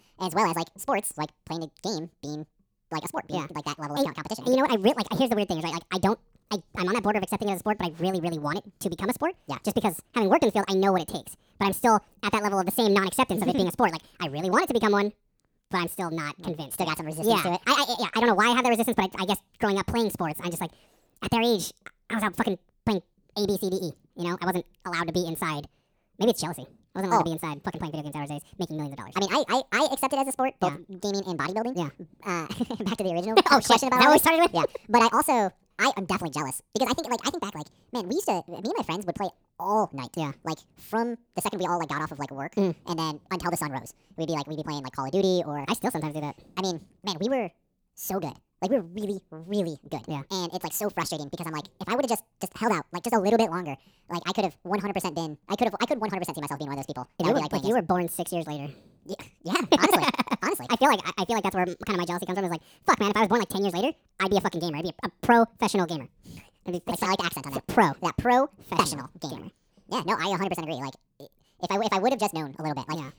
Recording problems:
wrong speed and pitch; too fast and too high; 1.7 times normal speed

